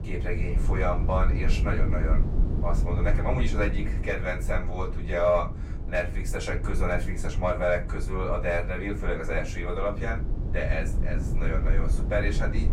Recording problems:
off-mic speech; far
room echo; very slight; dies away in 0.2 s
low rumble; noticeable; throughout; 15 dB below the speech

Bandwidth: 16 kHz